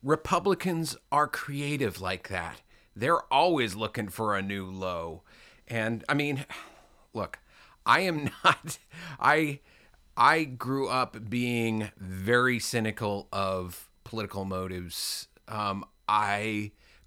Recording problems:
none

